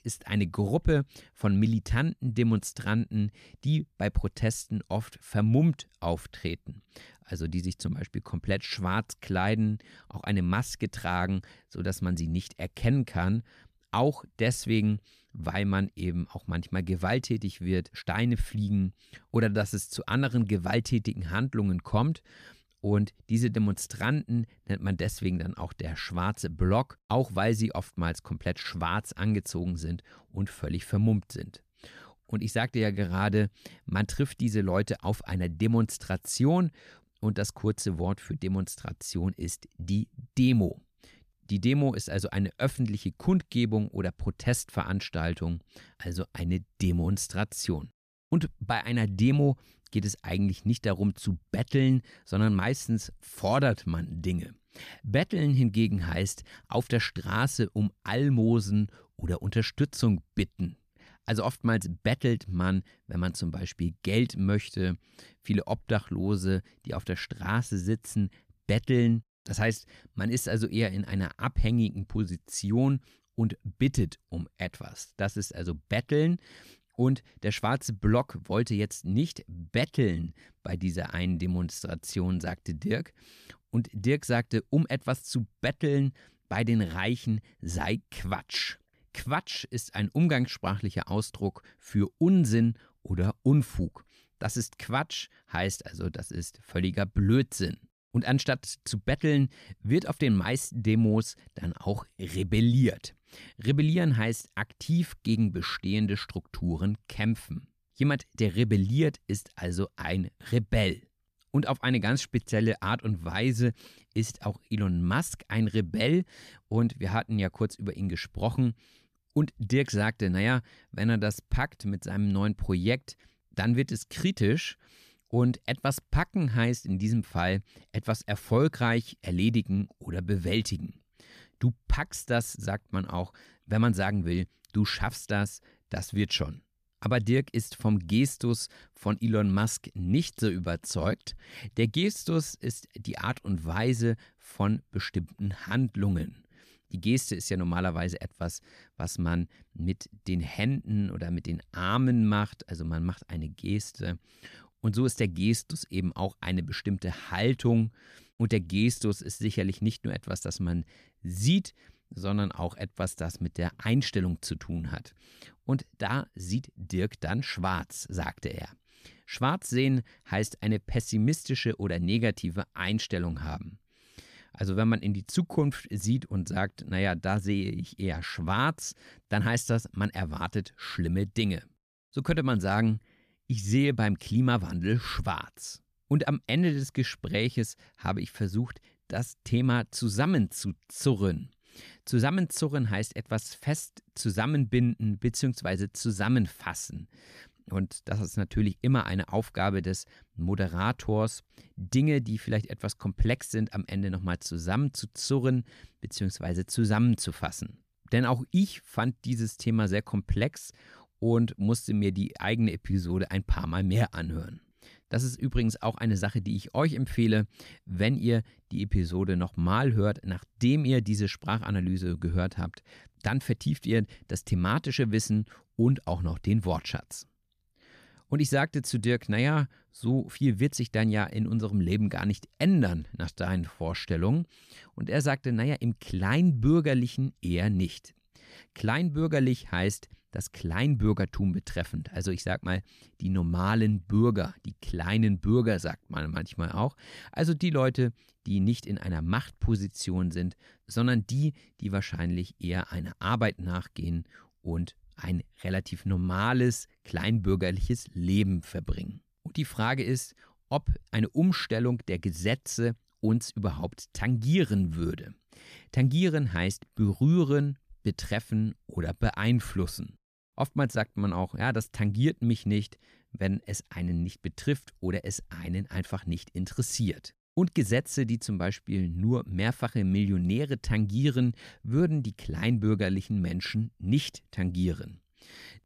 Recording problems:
none

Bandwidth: 14.5 kHz